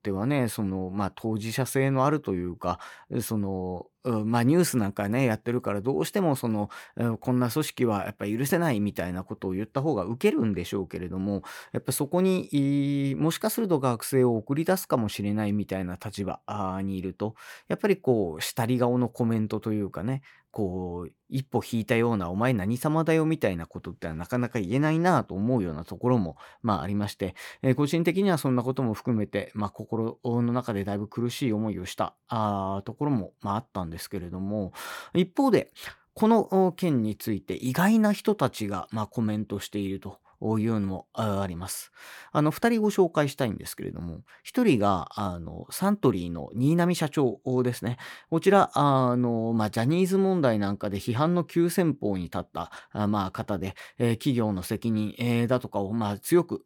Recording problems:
none

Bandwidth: 18 kHz